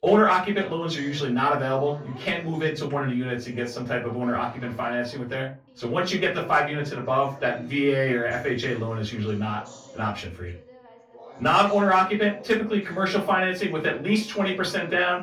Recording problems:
off-mic speech; far
room echo; very slight; dies away in 0.2 s
background chatter; faint; throughout; 2 voices, 20 dB below the speech

